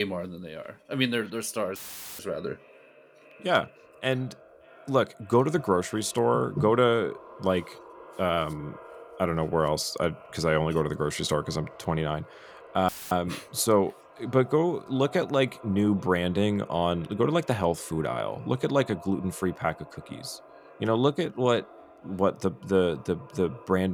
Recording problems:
echo of what is said; faint; throughout; 570 ms later, 20 dB below the speech
abrupt cut into speech; at the start and the end
audio cutting out; filled with static; at 2 s and at 13 s

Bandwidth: 19 kHz